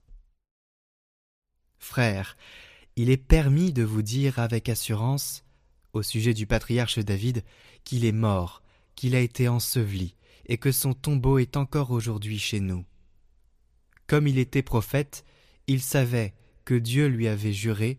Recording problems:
none

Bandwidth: 15 kHz